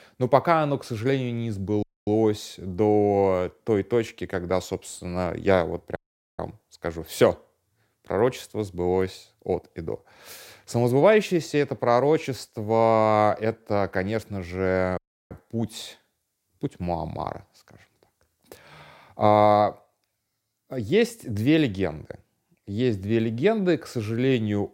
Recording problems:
audio cutting out; at 2 s, at 6 s and at 15 s

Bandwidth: 16 kHz